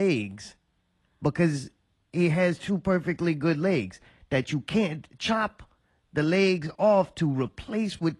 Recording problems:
garbled, watery; slightly
abrupt cut into speech; at the start

